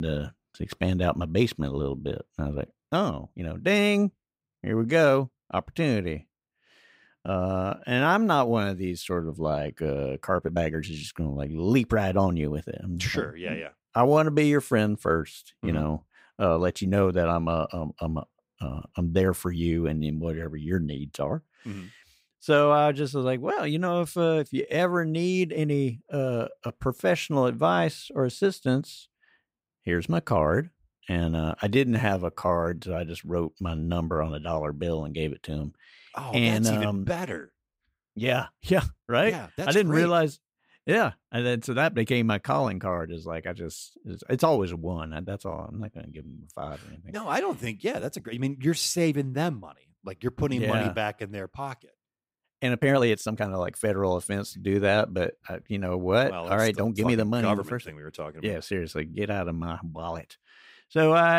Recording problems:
abrupt cut into speech; at the start and the end
uneven, jittery; strongly; from 2.5 to 57 s

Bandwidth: 15.5 kHz